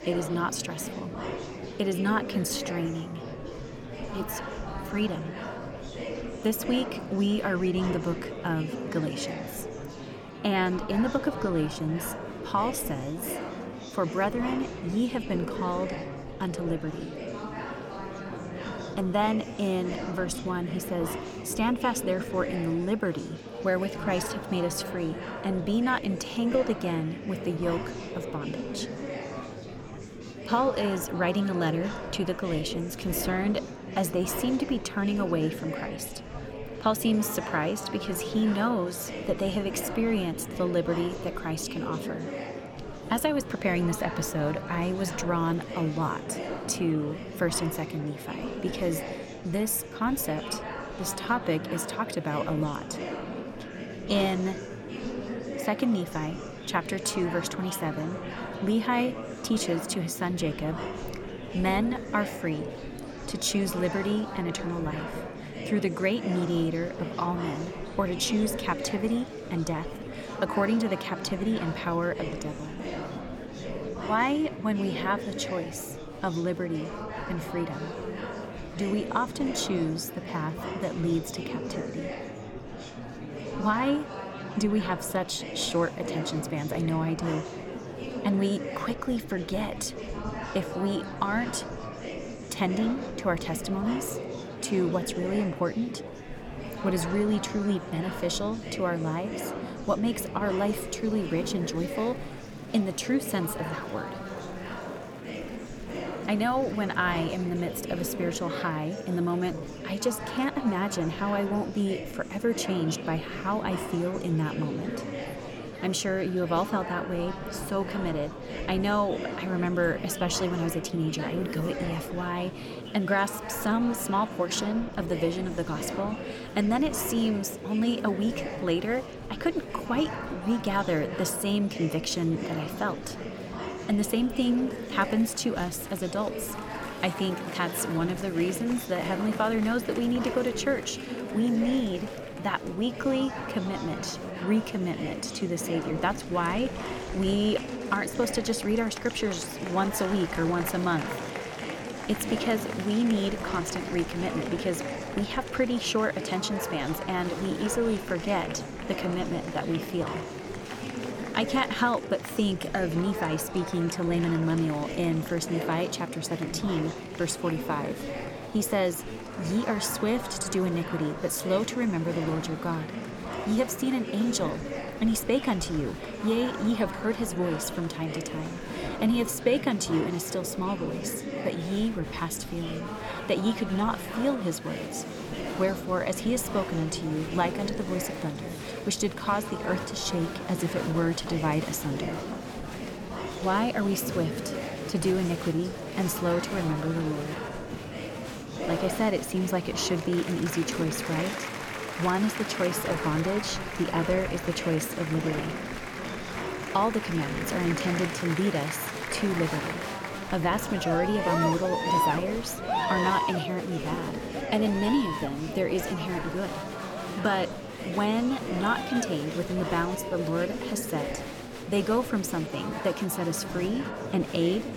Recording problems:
murmuring crowd; loud; throughout; 6 dB below the speech

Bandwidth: 17.5 kHz